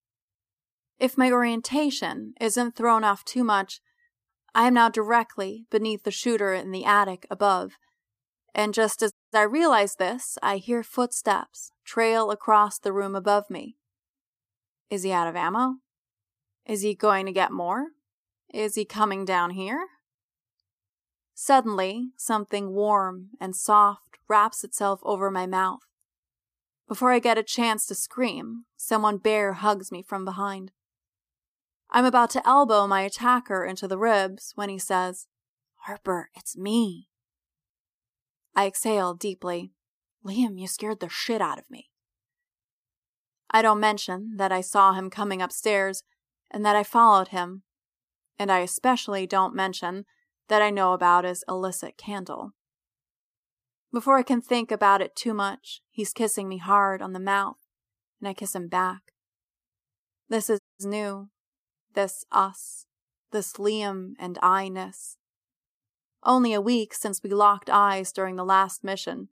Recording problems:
audio cutting out; at 9 s and at 1:01

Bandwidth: 15 kHz